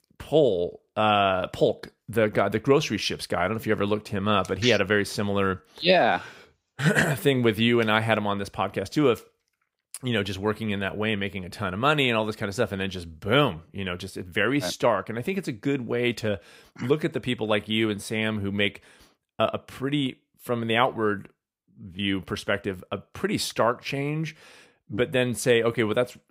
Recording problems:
none

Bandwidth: 15.5 kHz